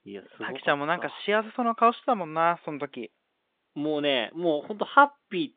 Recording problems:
phone-call audio

